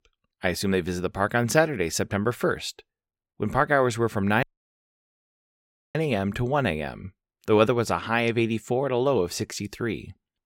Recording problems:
audio cutting out; at 4.5 s for 1.5 s

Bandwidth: 16 kHz